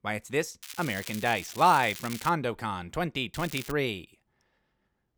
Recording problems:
crackling; noticeable; from 0.5 to 2.5 s and at 3.5 s; 15 dB below the speech

